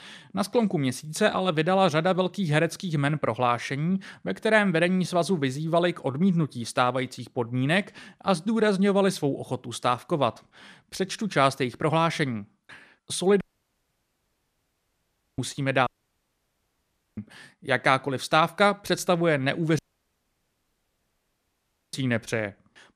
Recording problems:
audio cutting out; at 13 s for 2 s, at 16 s for 1.5 s and at 20 s for 2 s

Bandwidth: 14.5 kHz